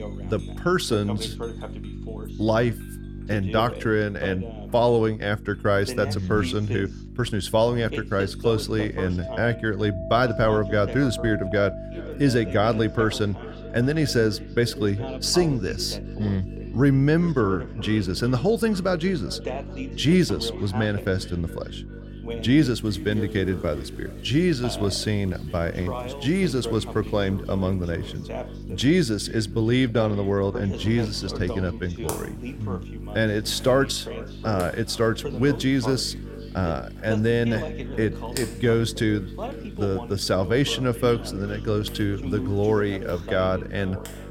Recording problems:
echo of what is said; faint; from 12 s on; 400 ms later, 20 dB below the speech
household noises; noticeable; throughout; 20 dB below the speech
voice in the background; noticeable; throughout; 15 dB below the speech
electrical hum; faint; throughout; 50 Hz, 20 dB below the speech

